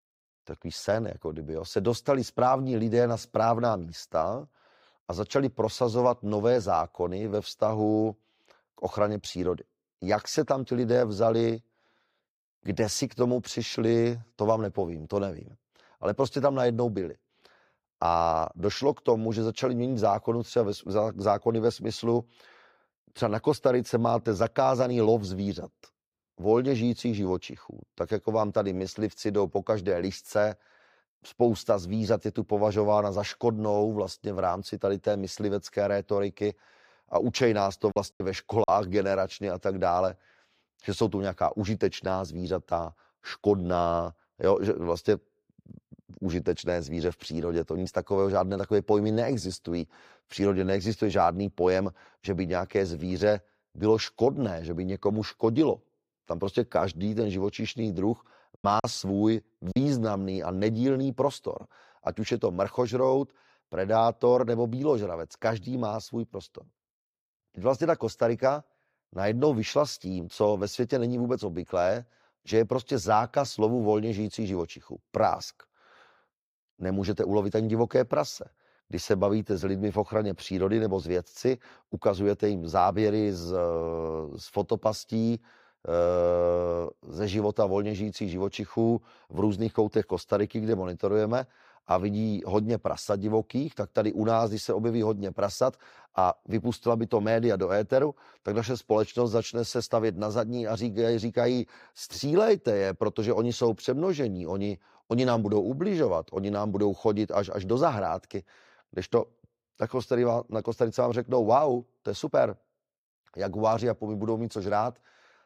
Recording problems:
choppy; very; at 38 s and from 59 s to 1:00; 9% of the speech affected

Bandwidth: 15.5 kHz